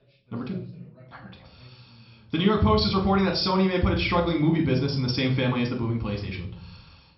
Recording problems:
high frequencies cut off; noticeable; nothing above 5.5 kHz
room echo; slight; dies away in 0.6 s
off-mic speech; somewhat distant
voice in the background; faint; throughout; 30 dB below the speech

